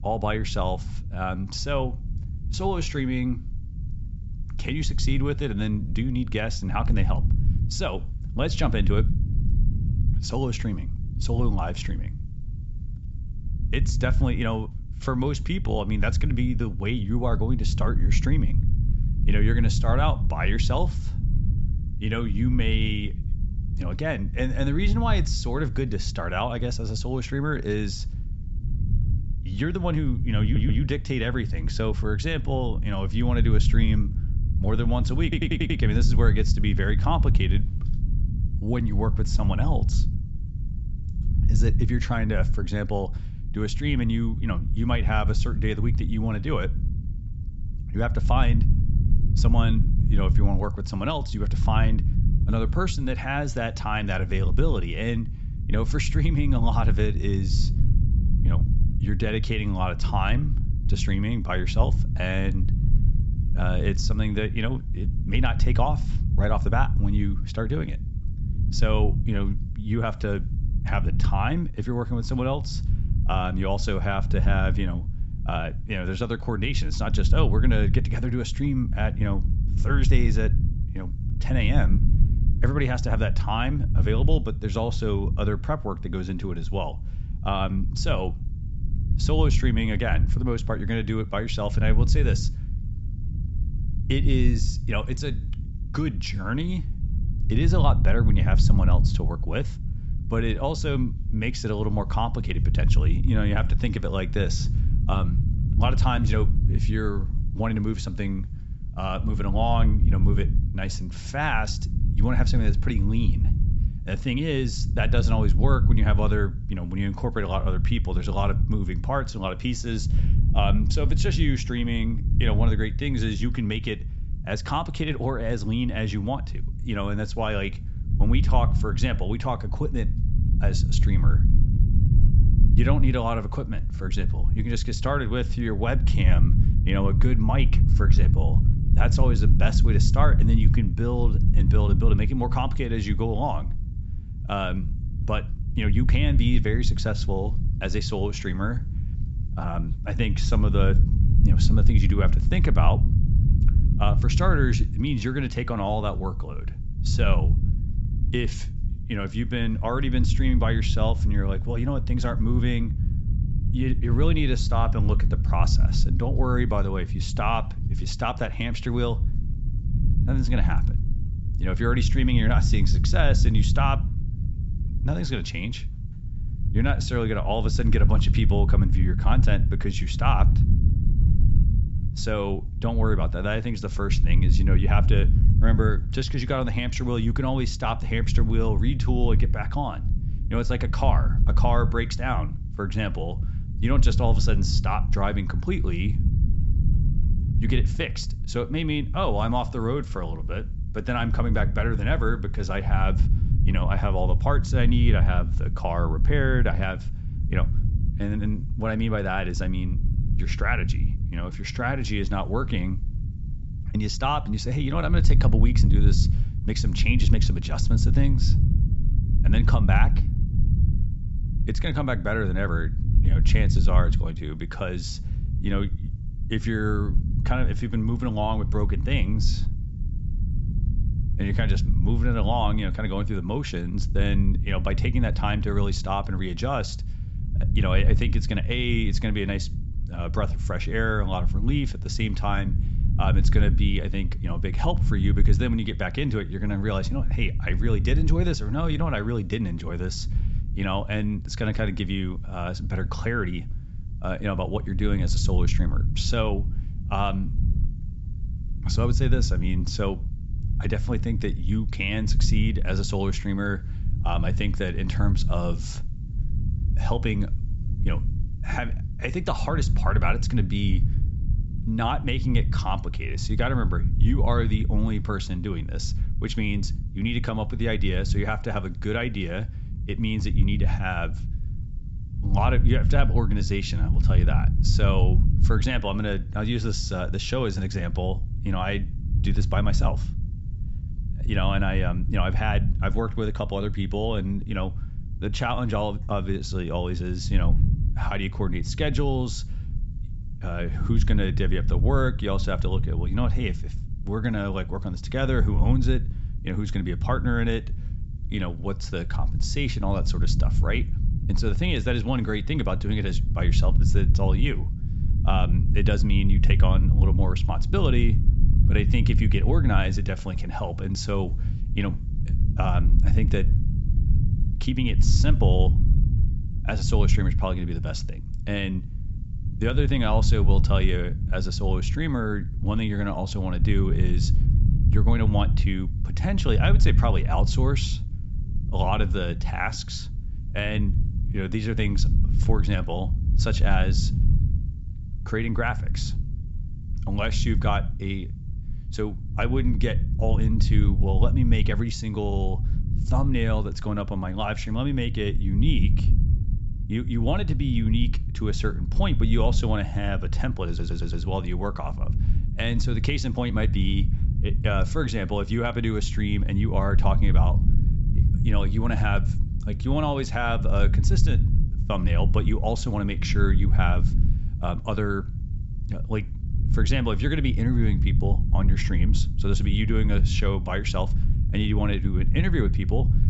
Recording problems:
high frequencies cut off; noticeable; nothing above 7.5 kHz
low rumble; noticeable; throughout; 10 dB below the speech
audio stuttering; at 30 s, at 35 s and at 6:01

